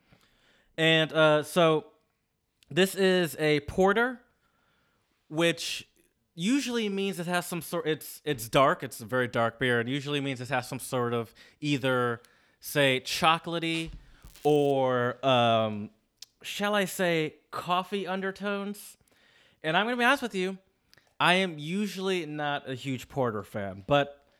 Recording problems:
crackling; faint; at 14 s; 25 dB below the speech

